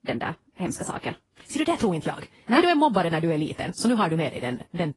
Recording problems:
wrong speed, natural pitch; too fast; 1.5 times normal speed
garbled, watery; slightly; nothing above 10.5 kHz

